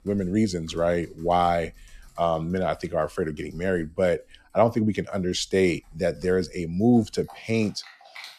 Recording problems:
household noises; faint; throughout; 25 dB below the speech

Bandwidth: 13.5 kHz